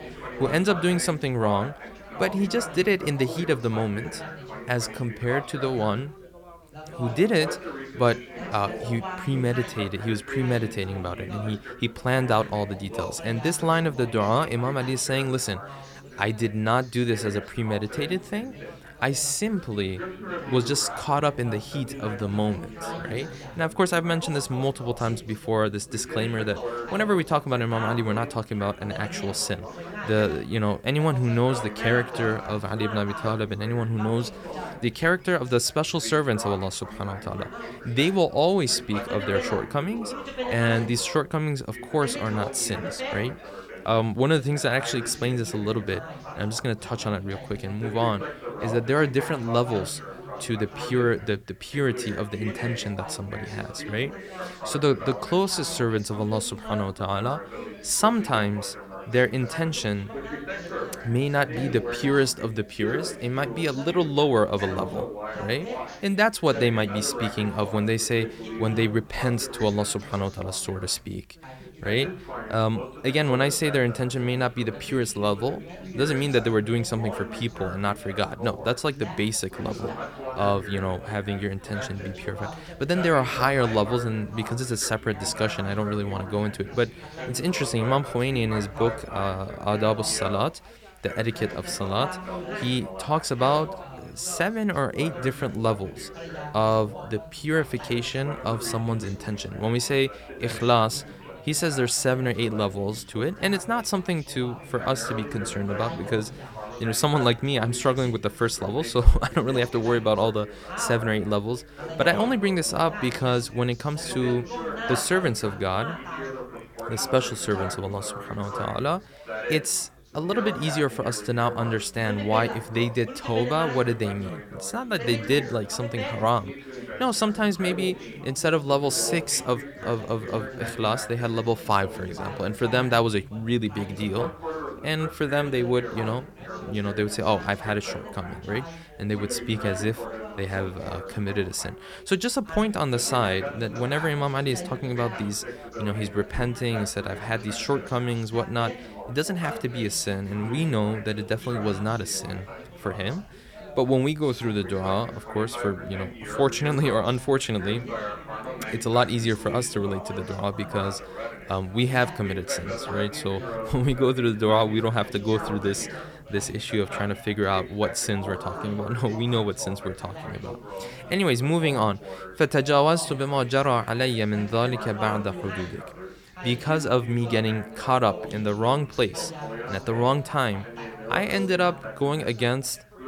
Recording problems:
background chatter; noticeable; throughout; 4 voices, 10 dB below the speech

